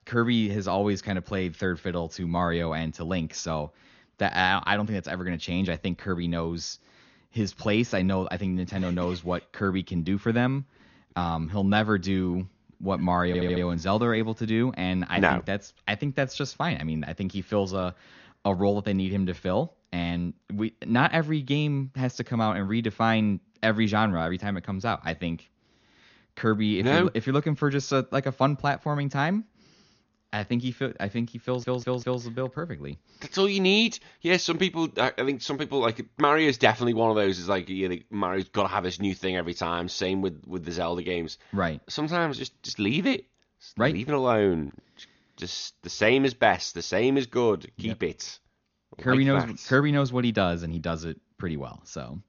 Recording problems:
high frequencies cut off; noticeable; nothing above 6.5 kHz
audio stuttering; at 13 s and at 31 s

